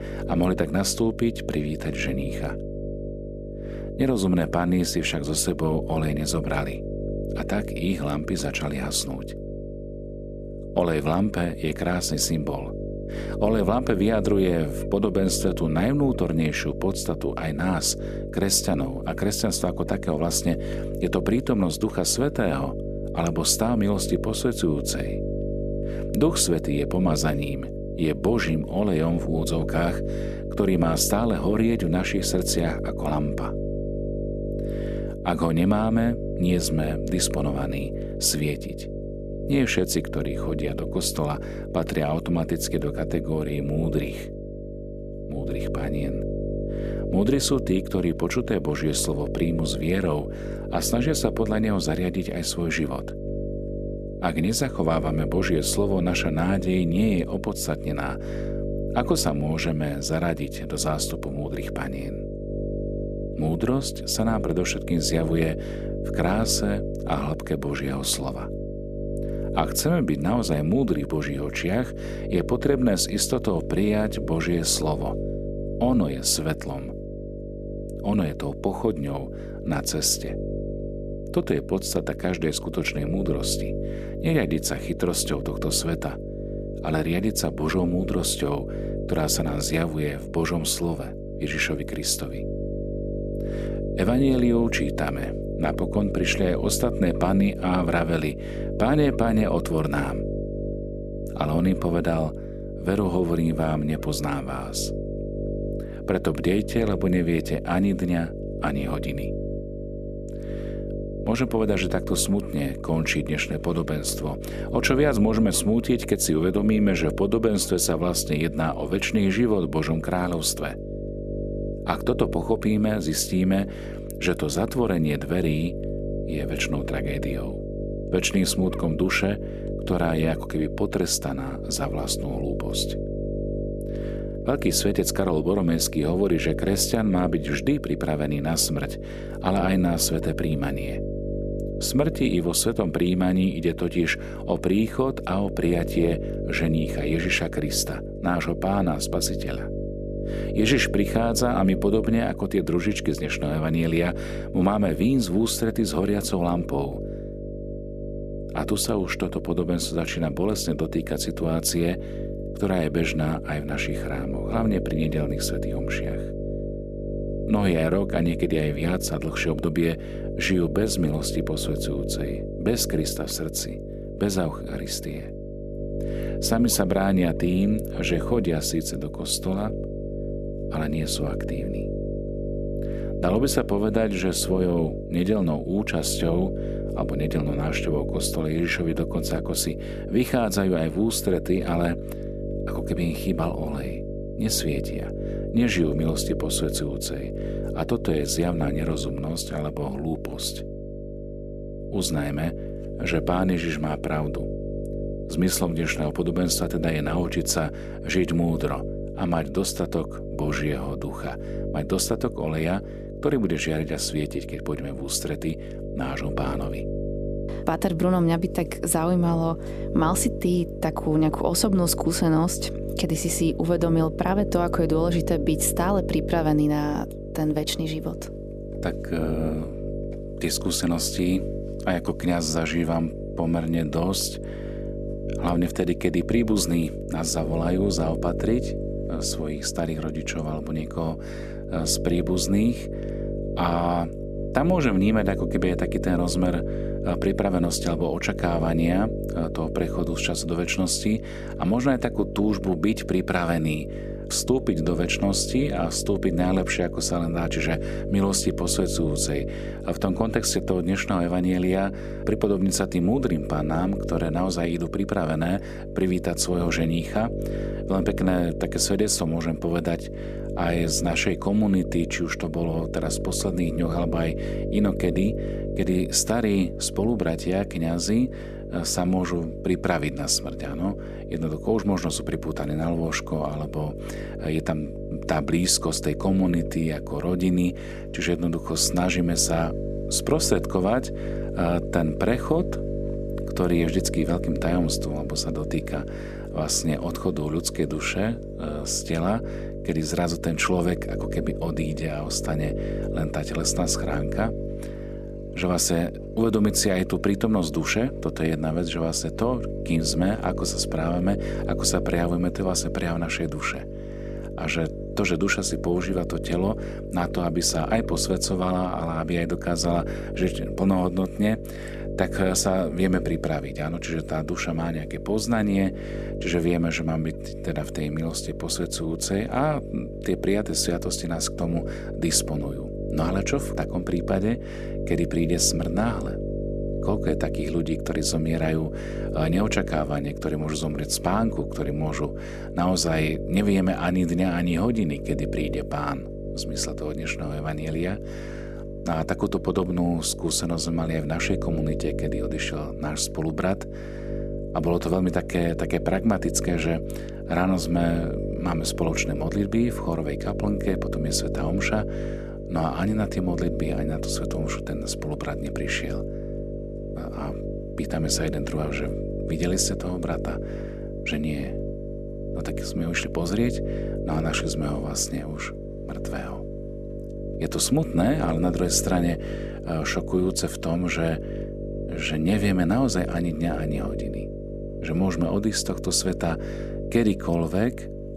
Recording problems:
electrical hum; loud; throughout; 50 Hz, 8 dB below the speech

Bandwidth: 14.5 kHz